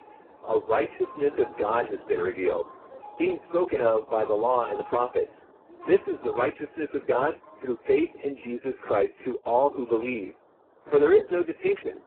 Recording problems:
phone-call audio; poor line; nothing above 3.5 kHz
garbled, watery; badly
train or aircraft noise; faint; throughout; 20 dB below the speech

